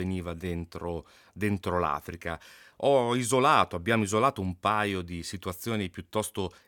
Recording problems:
abrupt cut into speech; at the start

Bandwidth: 17.5 kHz